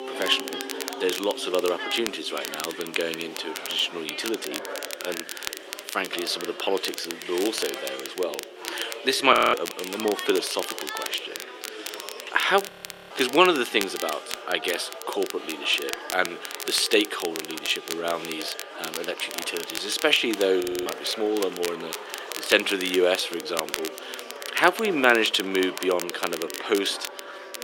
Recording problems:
thin; very; fading below 350 Hz
chatter from many people; noticeable; throughout; 15 dB below the speech
crackle, like an old record; noticeable; 10 dB below the speech
background music; faint; throughout; 20 dB below the speech
audio freezing; at 9.5 s, at 13 s and at 21 s

